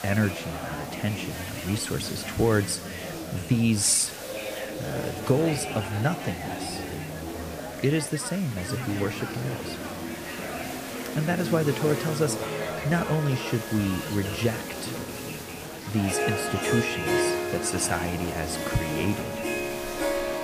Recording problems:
background music; loud; throughout; 5 dB below the speech
chatter from many people; loud; throughout; 7 dB below the speech
hiss; noticeable; throughout; 15 dB below the speech

